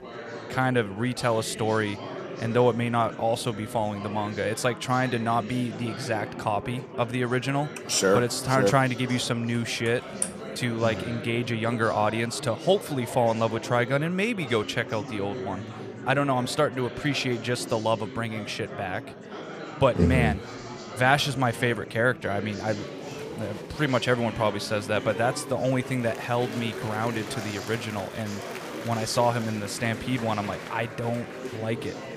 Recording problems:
murmuring crowd; noticeable; throughout; 10 dB below the speech

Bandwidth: 15 kHz